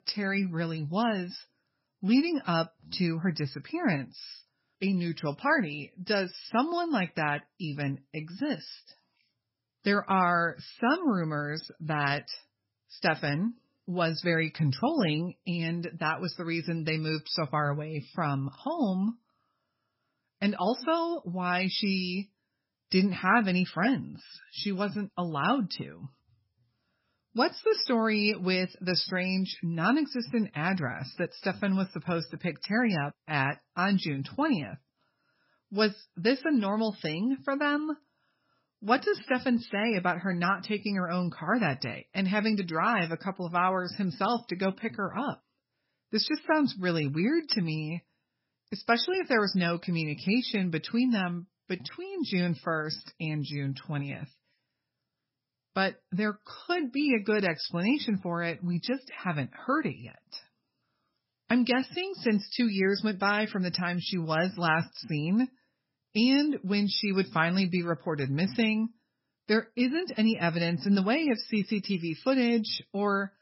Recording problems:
garbled, watery; badly; nothing above 5.5 kHz

